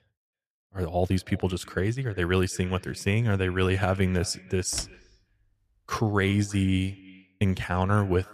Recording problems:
echo of what is said; faint; throughout; 330 ms later, 25 dB below the speech
door banging; faint; at 4.5 s; peak 15 dB below the speech

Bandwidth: 14.5 kHz